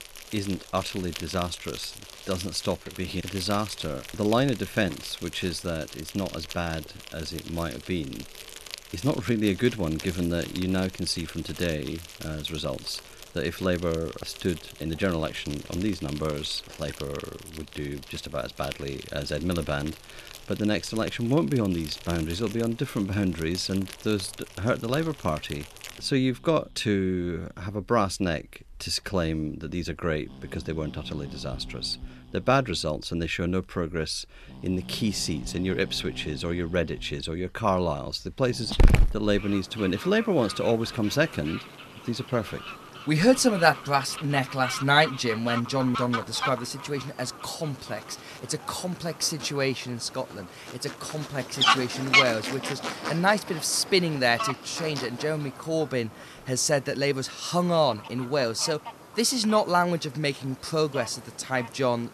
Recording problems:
animal sounds; loud; throughout; 7 dB below the speech

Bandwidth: 13.5 kHz